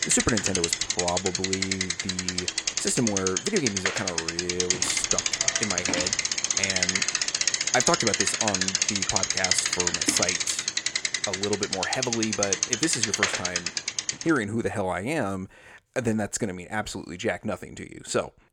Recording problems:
traffic noise; very loud; until 14 s; 5 dB above the speech

